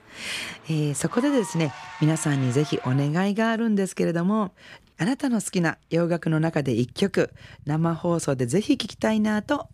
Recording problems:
traffic noise; noticeable; throughout; 20 dB below the speech

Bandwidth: 15 kHz